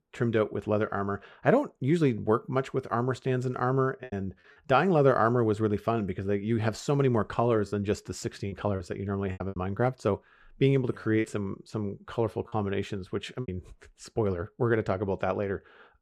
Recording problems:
choppy; very; at 4 s, from 8.5 to 9.5 s and from 11 to 13 s; 6% of the speech affected

